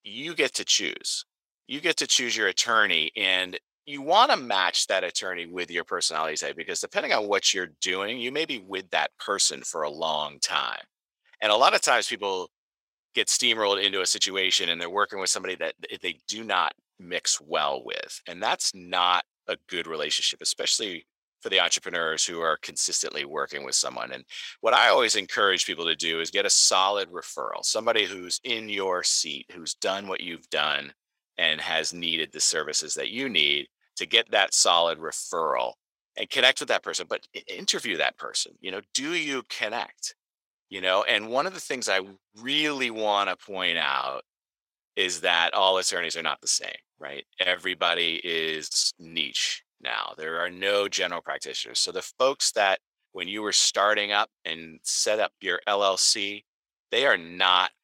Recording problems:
thin; very; fading below 650 Hz

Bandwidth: 16 kHz